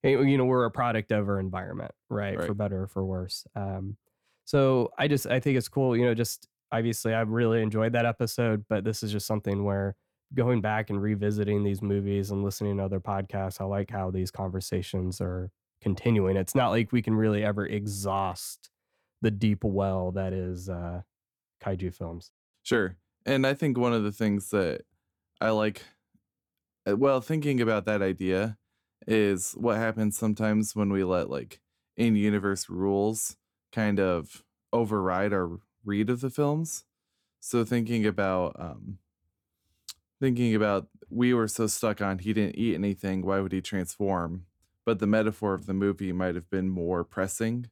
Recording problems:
none

